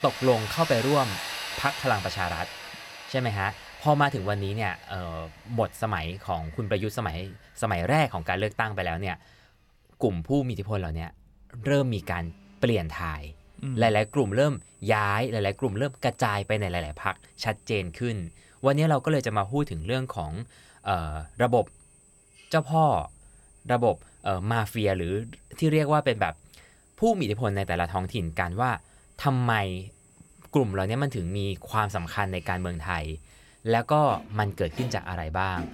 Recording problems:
machinery noise; noticeable; throughout; 10 dB below the speech

